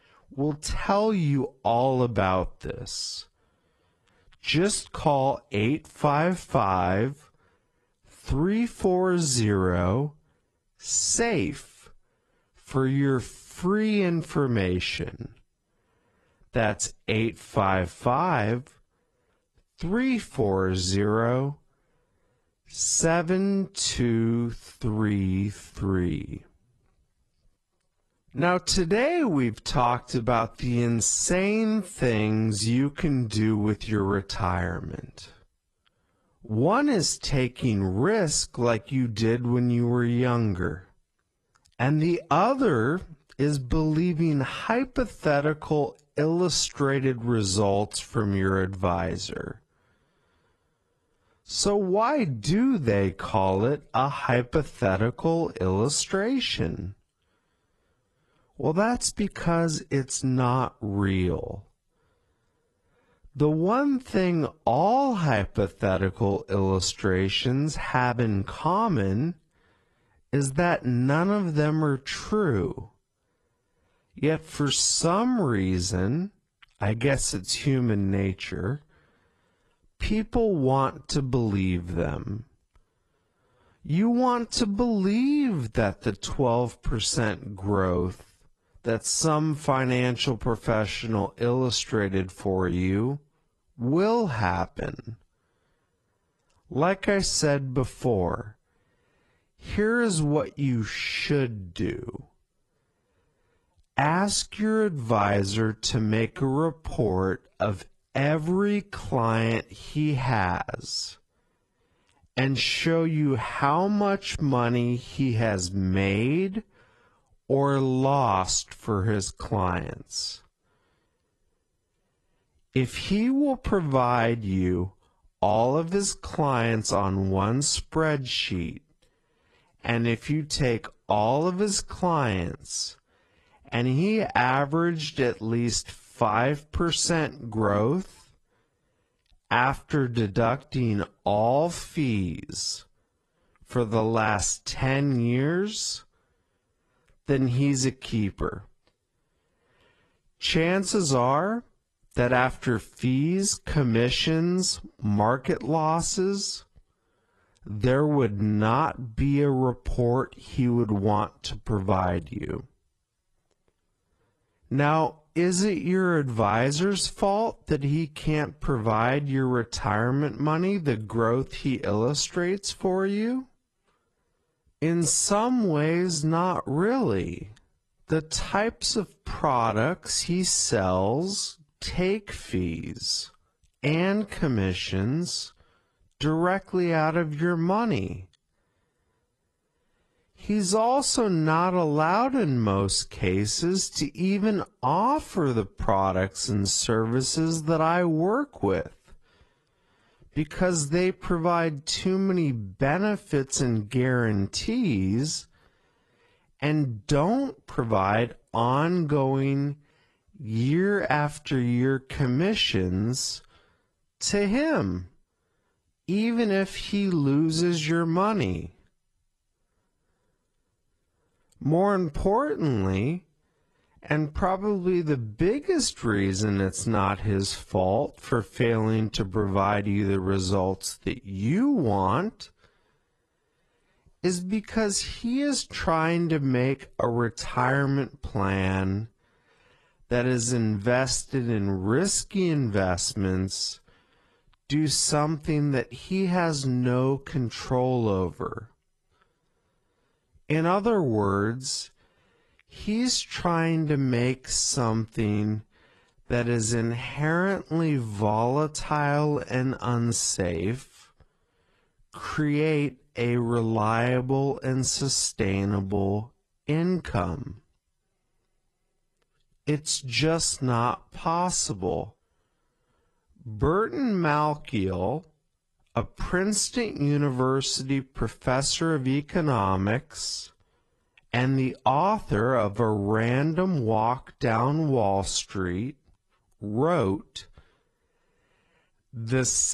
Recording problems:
wrong speed, natural pitch; too slow; 0.6 times normal speed
garbled, watery; slightly
abrupt cut into speech; at the end

